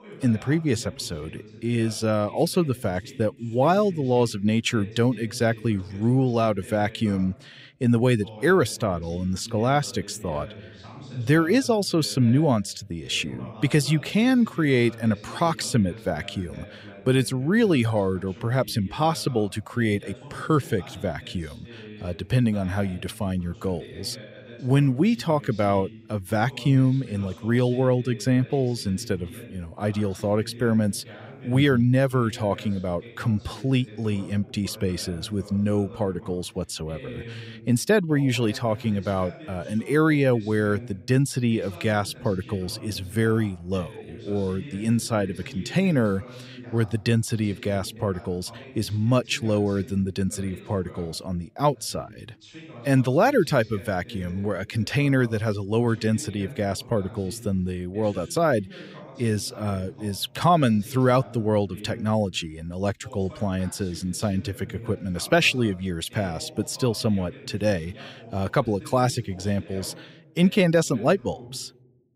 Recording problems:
voice in the background; noticeable; throughout; 20 dB below the speech

